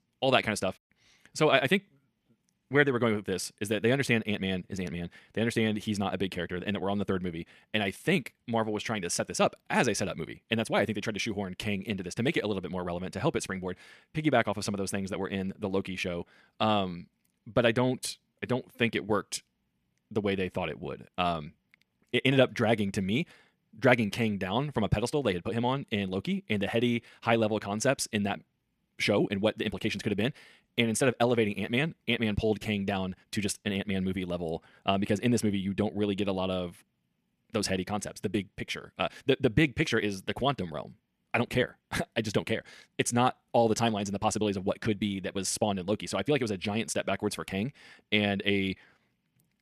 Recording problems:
wrong speed, natural pitch; too fast; 1.5 times normal speed

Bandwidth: 14.5 kHz